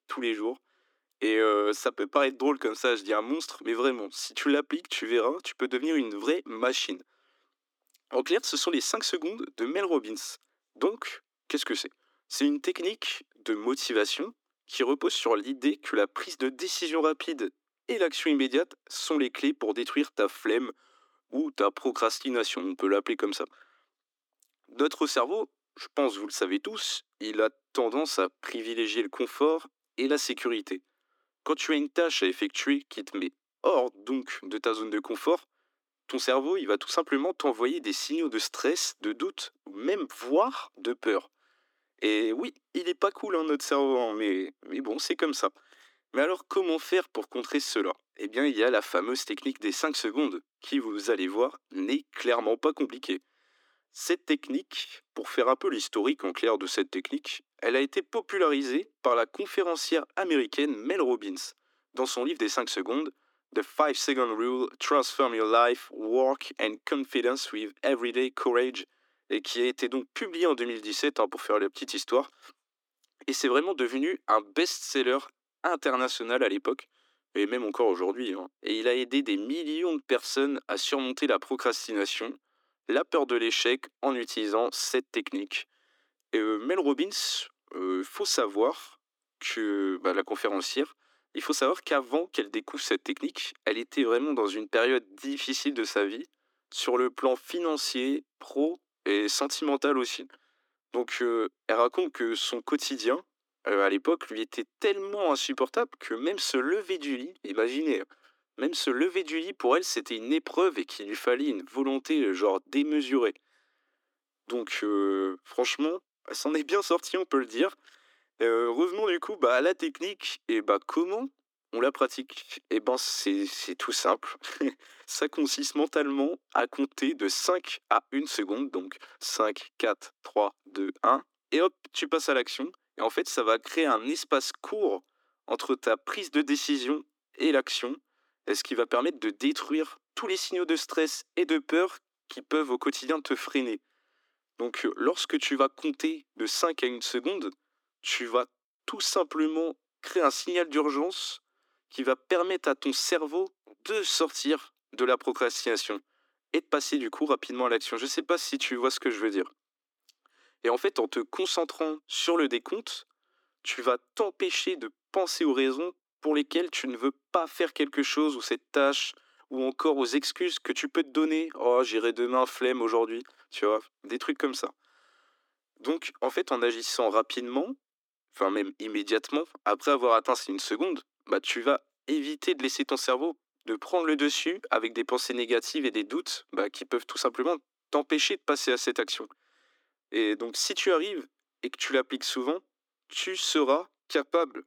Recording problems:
thin; somewhat; fading below 300 Hz

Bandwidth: 18 kHz